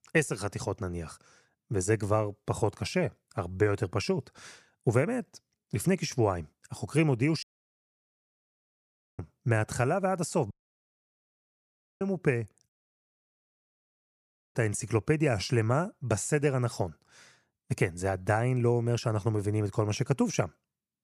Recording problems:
audio cutting out; at 7.5 s for 2 s, at 11 s for 1.5 s and at 13 s for 2 s

